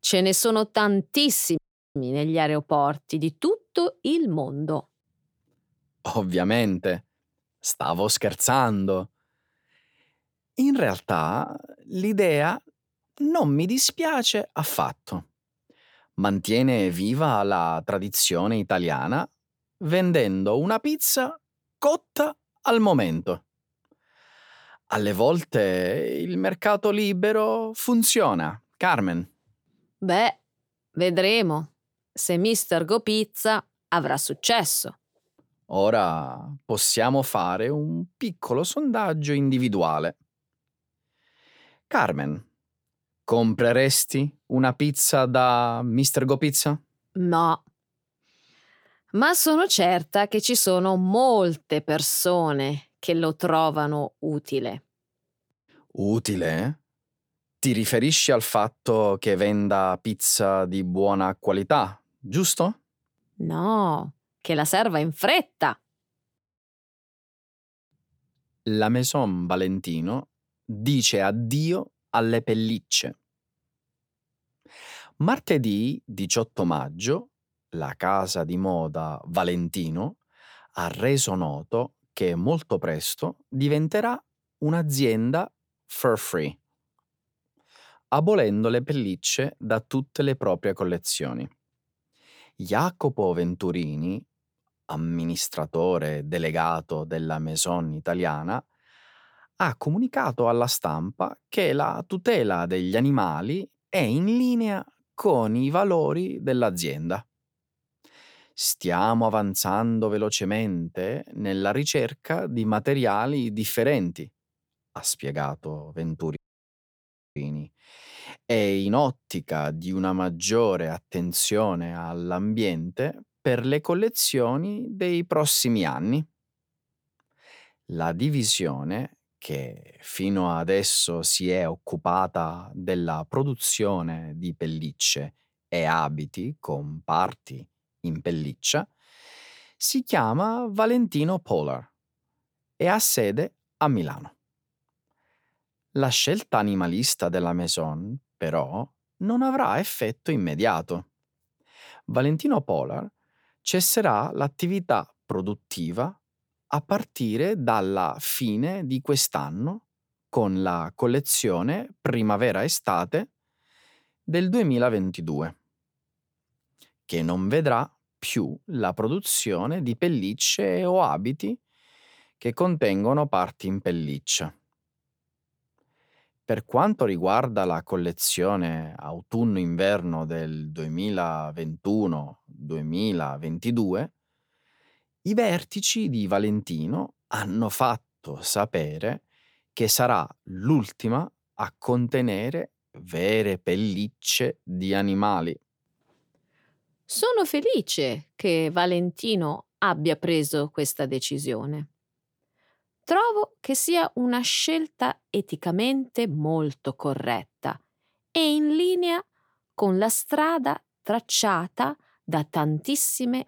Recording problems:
audio cutting out; at 1.5 s and at 1:56 for 1 s

